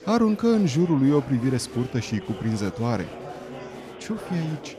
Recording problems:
murmuring crowd; noticeable; throughout; 15 dB below the speech

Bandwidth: 14.5 kHz